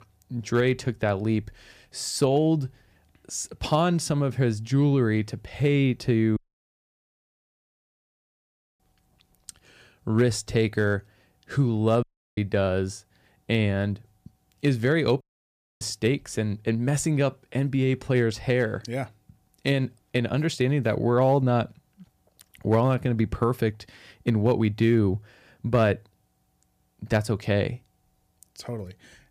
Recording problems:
audio cutting out; at 6.5 s for 2.5 s, at 12 s and at 15 s for 0.5 s

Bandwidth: 15 kHz